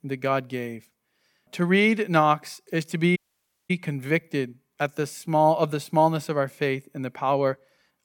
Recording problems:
audio cutting out; at 3 s for 0.5 s

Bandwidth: 18 kHz